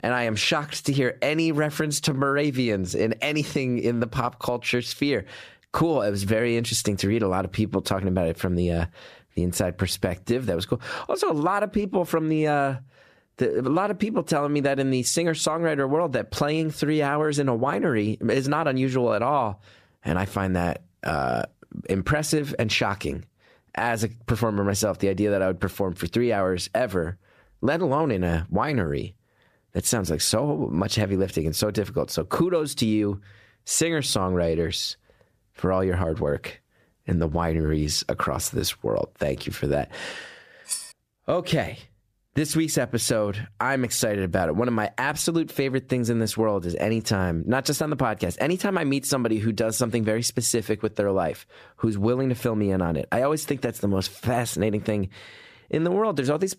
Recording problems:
squashed, flat; somewhat
clattering dishes; noticeable; at 41 s; peak 6 dB below the speech

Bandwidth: 14.5 kHz